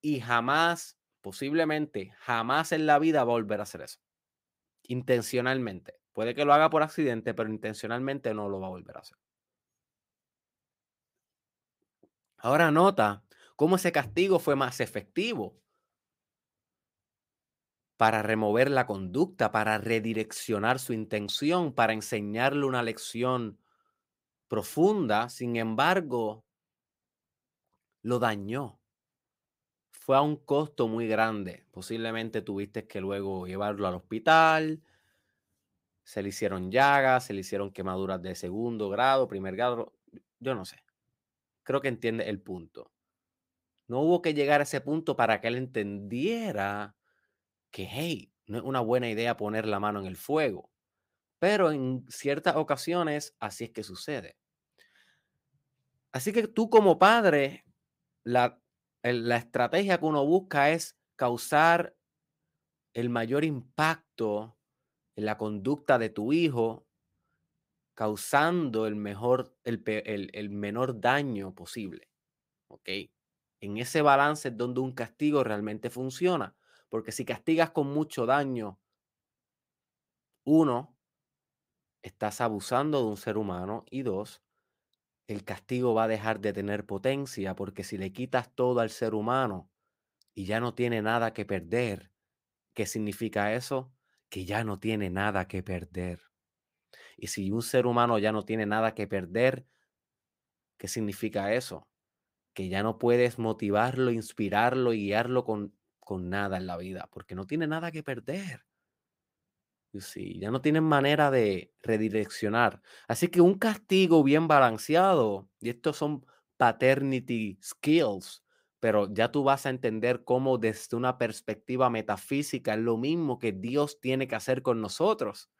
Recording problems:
none

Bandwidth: 15.5 kHz